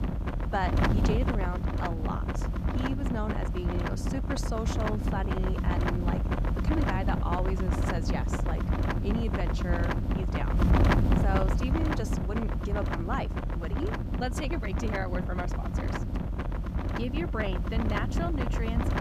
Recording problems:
wind noise on the microphone; heavy; 1 dB above the speech

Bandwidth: 14.5 kHz